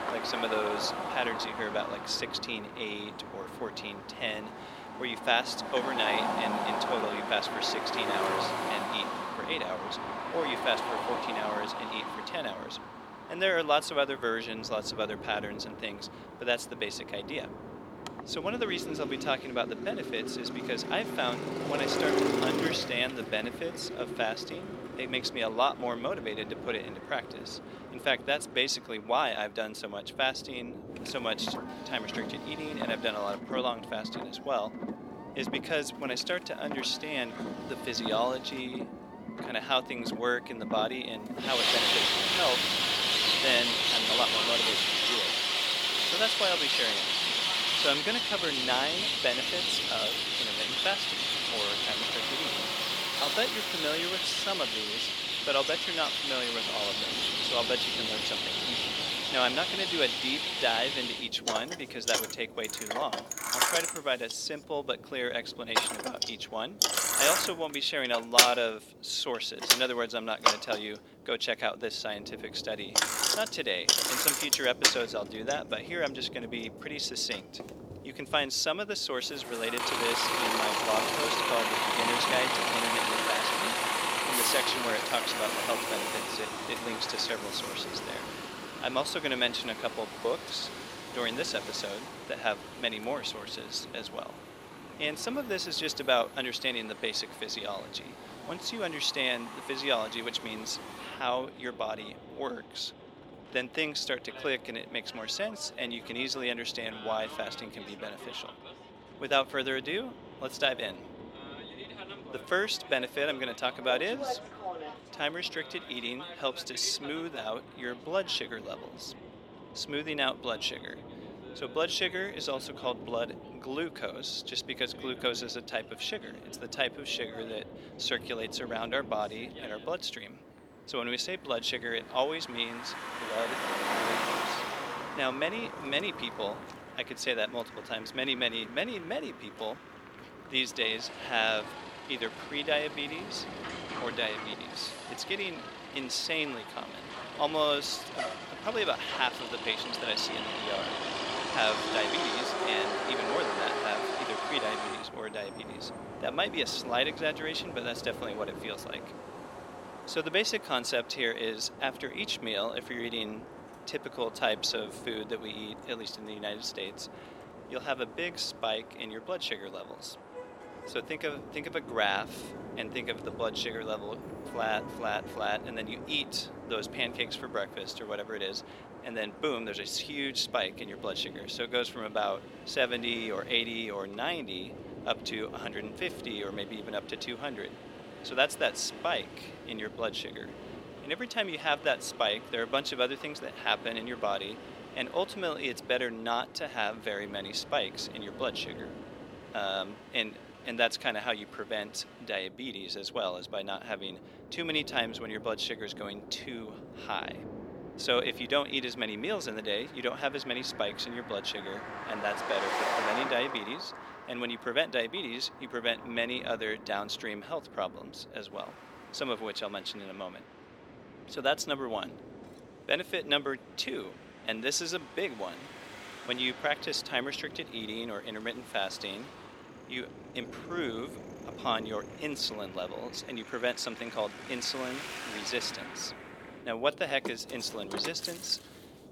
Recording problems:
thin; somewhat; fading below 450 Hz
traffic noise; very loud; throughout; 2 dB above the speech
wind noise on the microphone; occasional gusts; 20 dB below the speech

